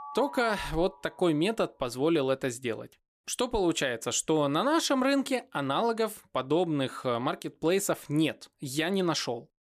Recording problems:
alarms or sirens; noticeable; until 2 s; 15 dB below the speech

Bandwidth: 15 kHz